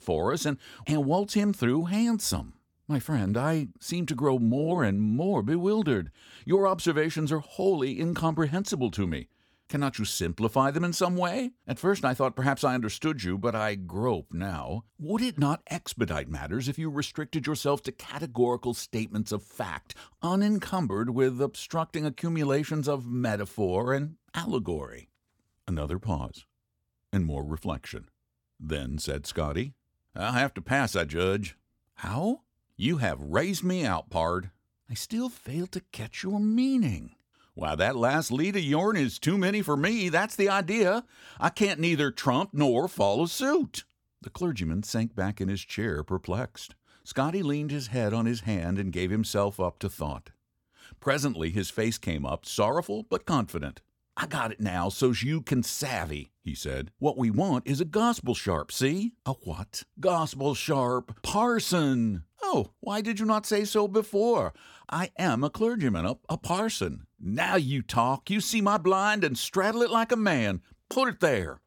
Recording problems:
none

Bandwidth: 18 kHz